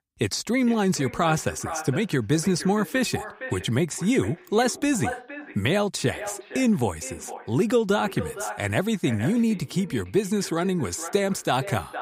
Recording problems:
echo of what is said; noticeable; throughout; 460 ms later, 15 dB below the speech

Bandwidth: 15.5 kHz